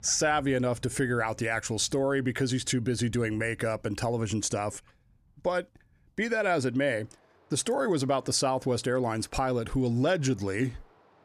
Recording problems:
rain or running water; faint; throughout; 30 dB below the speech

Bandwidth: 15 kHz